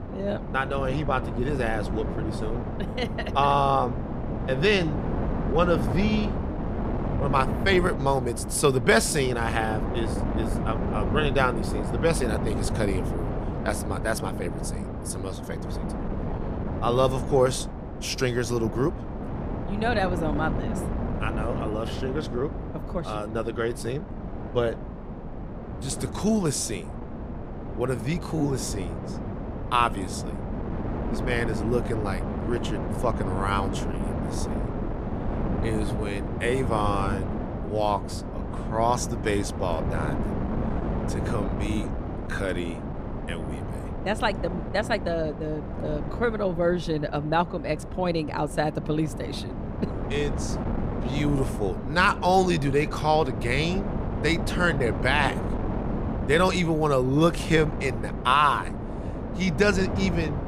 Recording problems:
wind noise on the microphone; heavy; 9 dB below the speech

